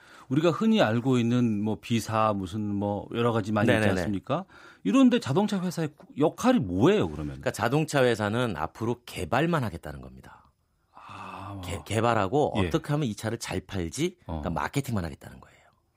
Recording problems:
none

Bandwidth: 15.5 kHz